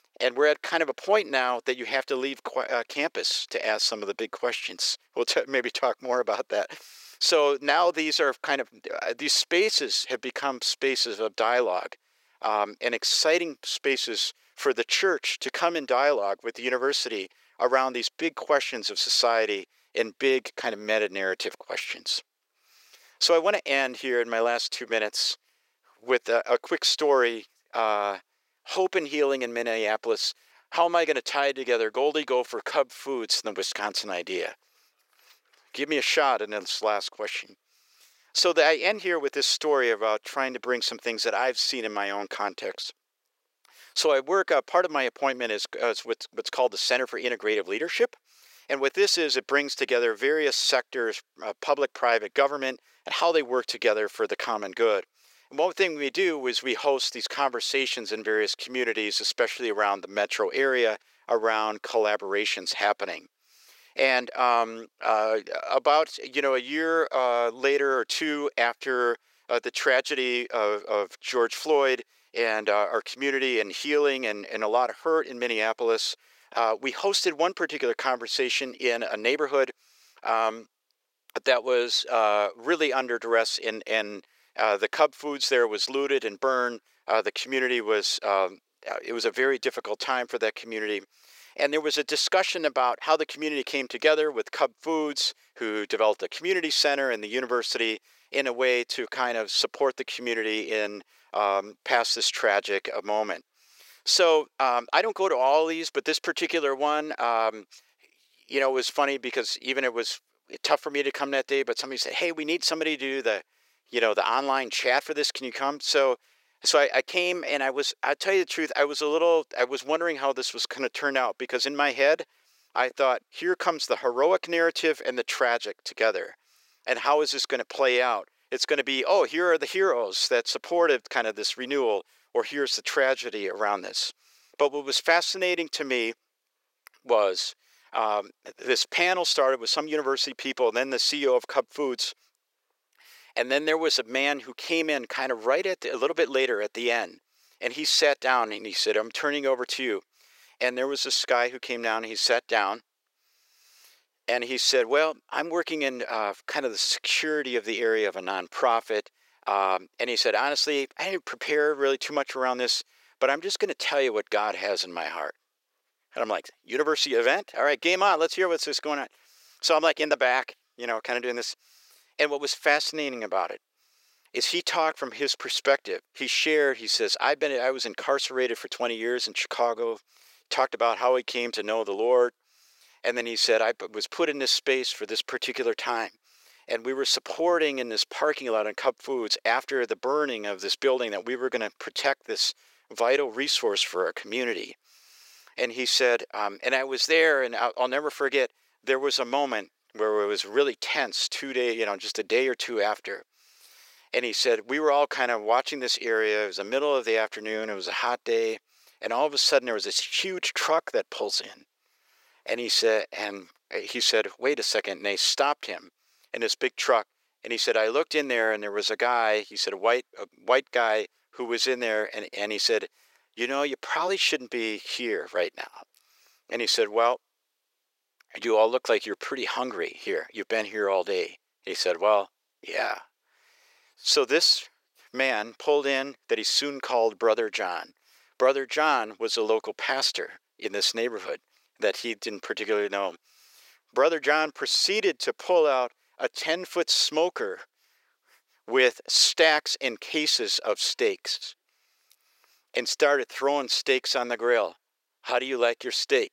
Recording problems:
thin; very; fading below 450 Hz

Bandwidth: 16 kHz